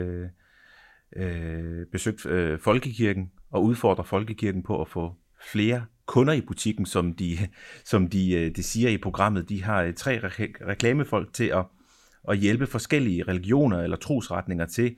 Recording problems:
abrupt cut into speech; at the start

